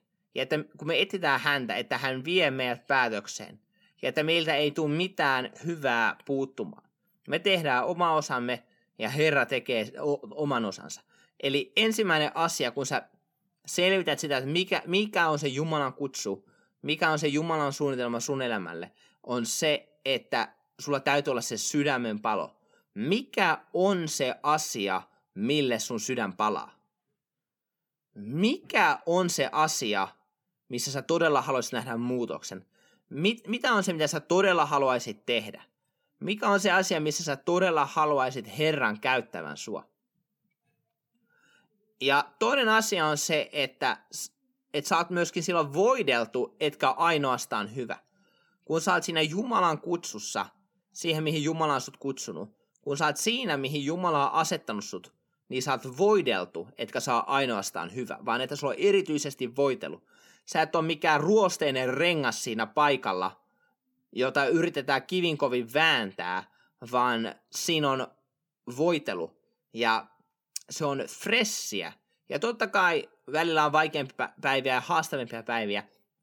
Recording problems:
none

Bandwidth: 18 kHz